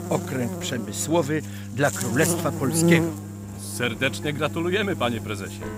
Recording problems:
electrical hum; loud; throughout; 50 Hz, 7 dB below the speech
background music; faint; throughout; 25 dB below the speech

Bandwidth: 15.5 kHz